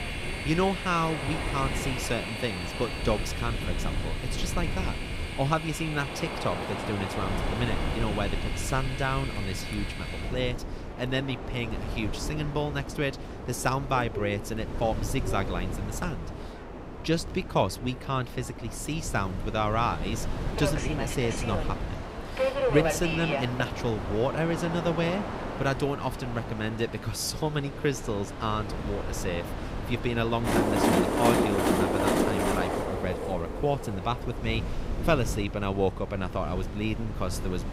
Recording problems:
train or aircraft noise; loud; throughout; 3 dB below the speech
wind noise on the microphone; occasional gusts; 15 dB below the speech
chatter from many people; faint; throughout; 25 dB below the speech

